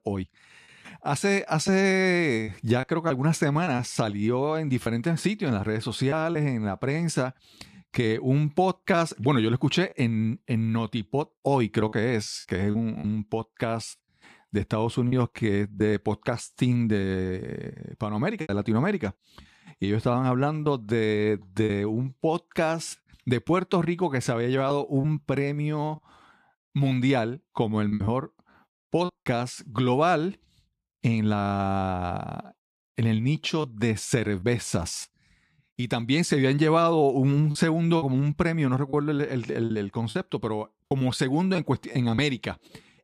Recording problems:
choppy; occasionally; 4% of the speech affected

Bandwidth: 14.5 kHz